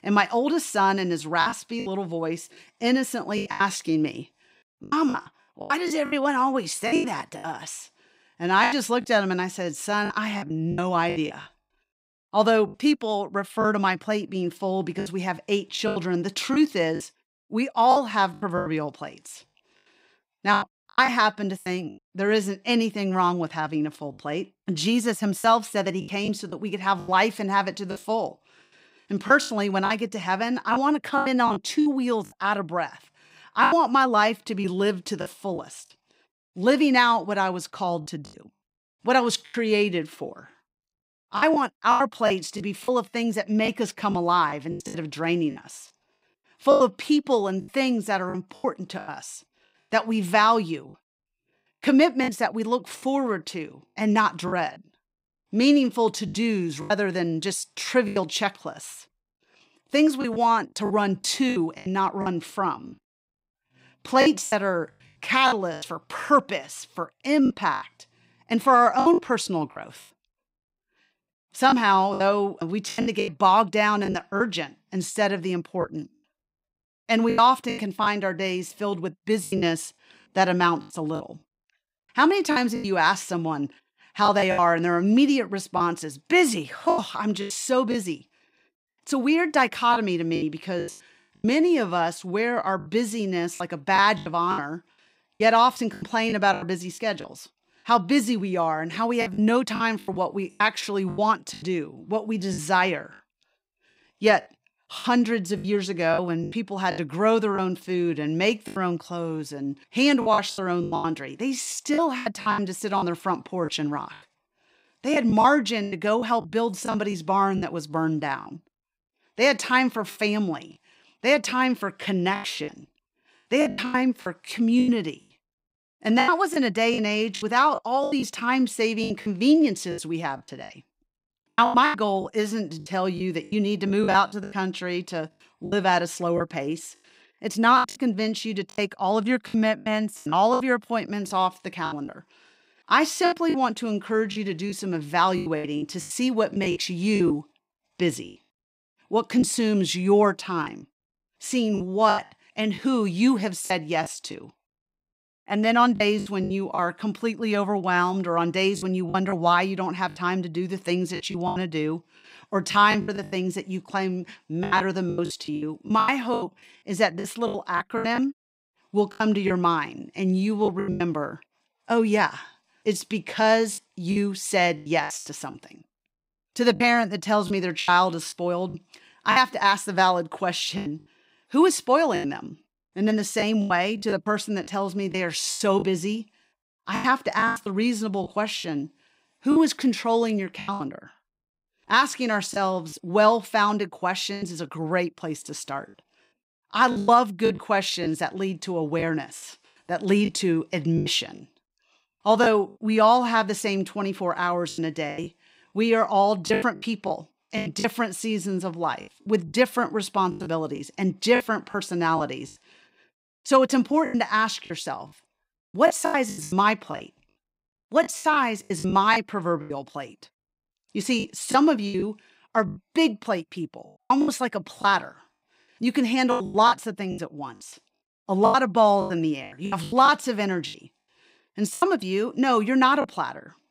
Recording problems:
choppy; very; 10% of the speech affected

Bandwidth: 15.5 kHz